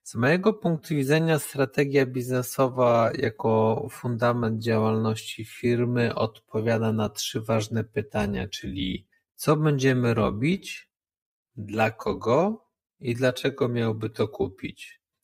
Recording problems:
wrong speed, natural pitch; too slow; 0.6 times normal speed

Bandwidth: 15.5 kHz